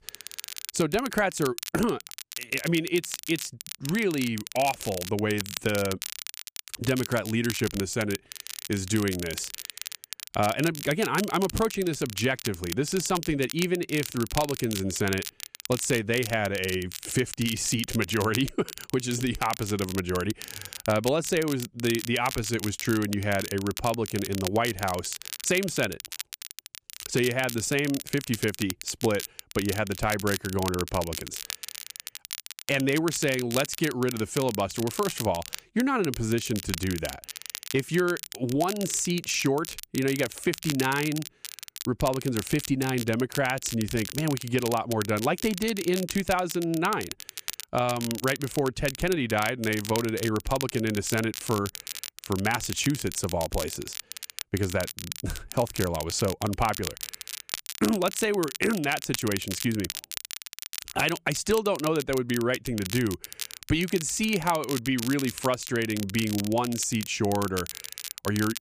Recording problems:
crackle, like an old record; loud; 9 dB below the speech

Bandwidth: 15 kHz